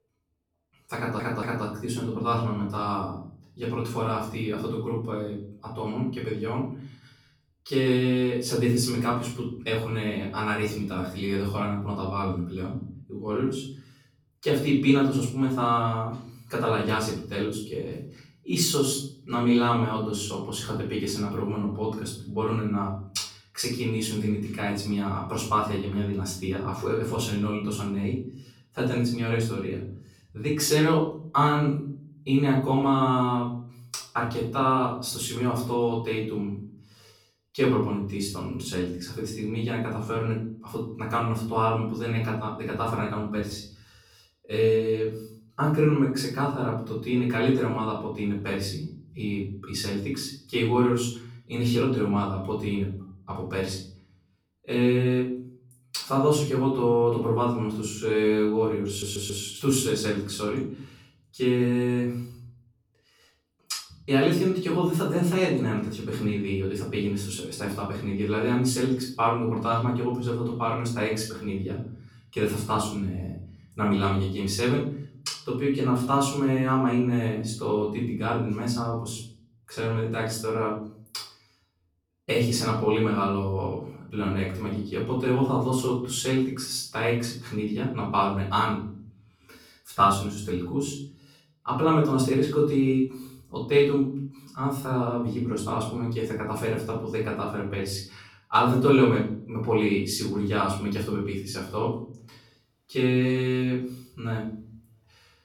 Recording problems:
off-mic speech; far
room echo; noticeable; dies away in 0.6 s
audio stuttering; at 1 s and at 59 s

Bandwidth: 18.5 kHz